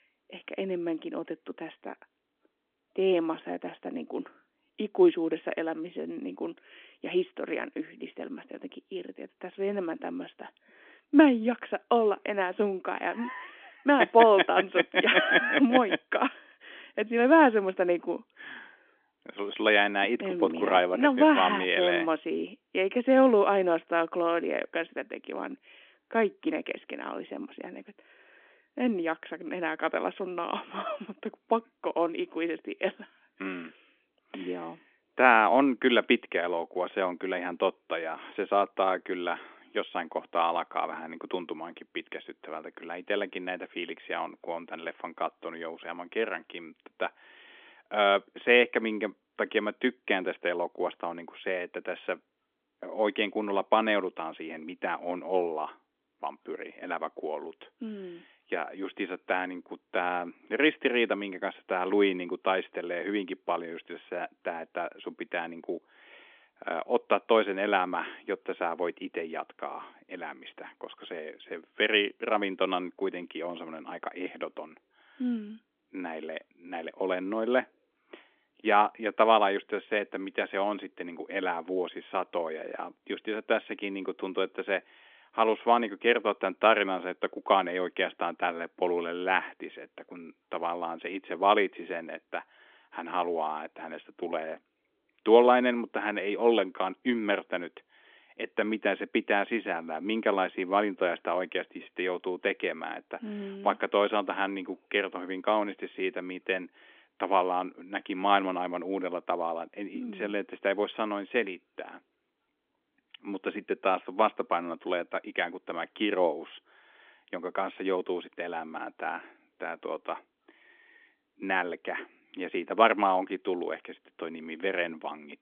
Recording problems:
phone-call audio; nothing above 3.5 kHz

